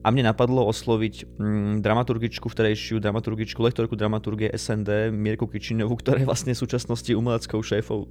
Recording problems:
electrical hum; faint; throughout; 60 Hz, 25 dB below the speech

